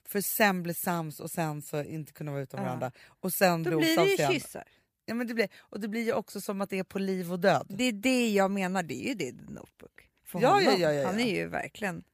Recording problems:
none

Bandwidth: 15 kHz